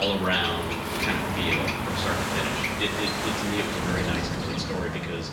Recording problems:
room echo; slight; dies away in 0.8 s
off-mic speech; somewhat distant
animal sounds; loud; throughout; 3 dB below the speech
rain or running water; loud; throughout; 3 dB below the speech
traffic noise; loud; throughout; 4 dB below the speech
abrupt cut into speech; at the start

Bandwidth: 17.5 kHz